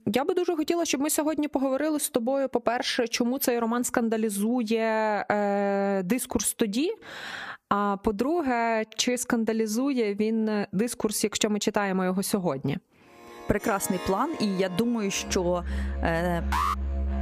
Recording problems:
squashed, flat; somewhat, background pumping
background music; loud; from 14 s on; 10 dB below the speech
alarm; noticeable; at 17 s; peak 1 dB below the speech

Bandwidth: 15 kHz